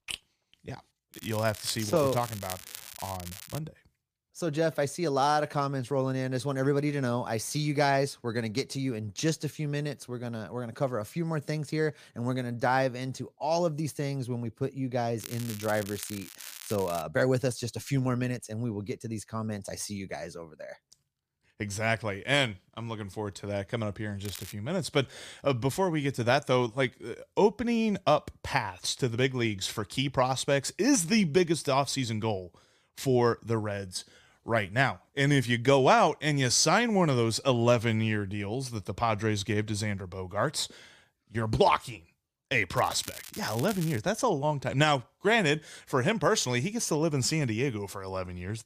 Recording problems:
crackling; noticeable; 4 times, first at 1 s; 15 dB below the speech

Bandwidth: 15 kHz